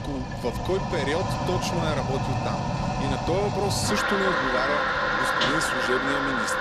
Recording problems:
household noises; very loud; throughout; 4 dB above the speech

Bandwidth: 13.5 kHz